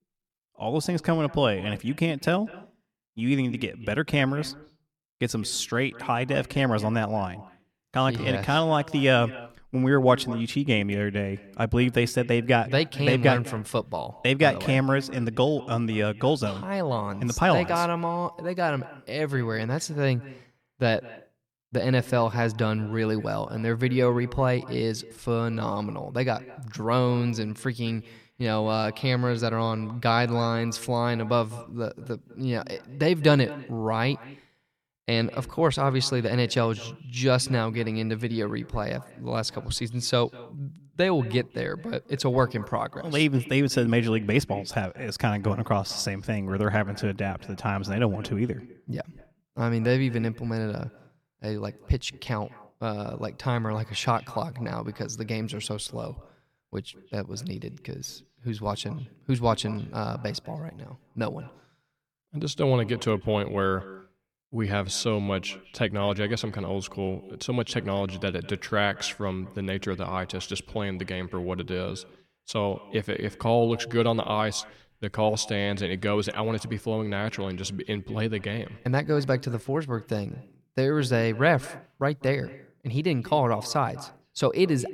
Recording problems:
echo of what is said; faint; throughout; 200 ms later, 20 dB below the speech

